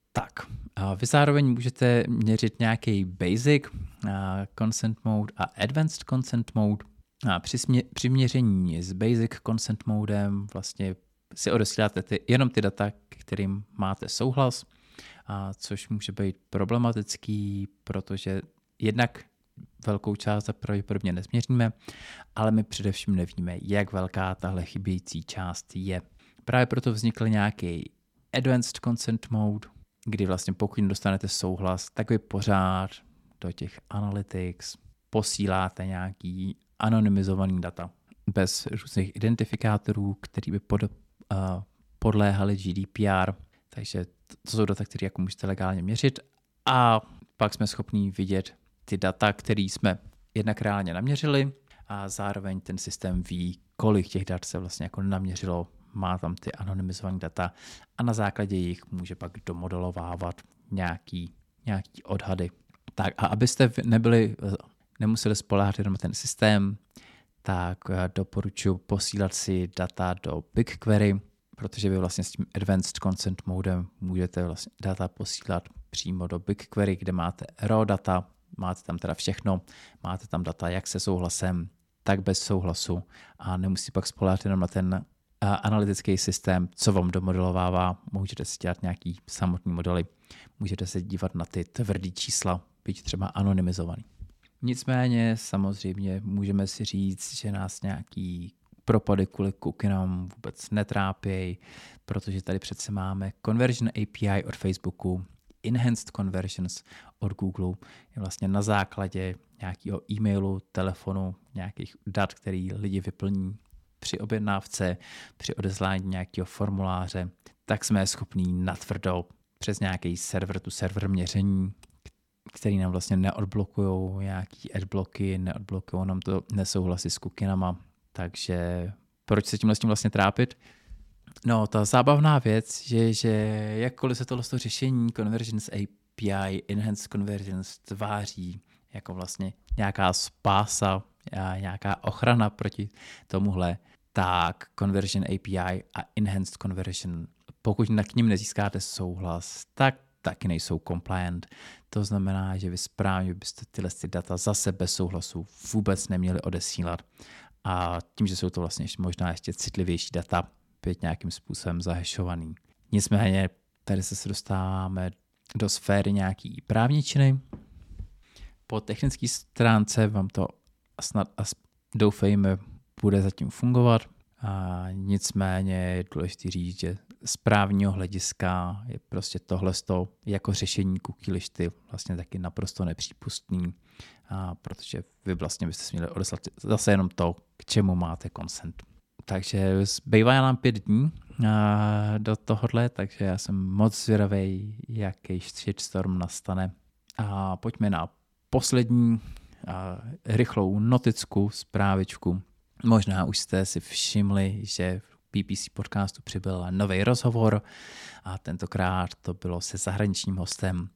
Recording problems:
none

